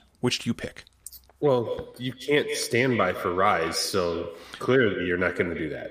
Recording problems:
echo of what is said; strong; from 1.5 s on; 150 ms later, 10 dB below the speech

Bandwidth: 15 kHz